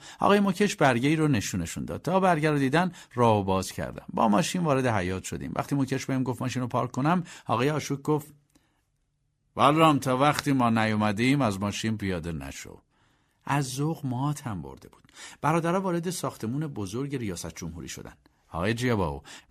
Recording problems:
none

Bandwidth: 14.5 kHz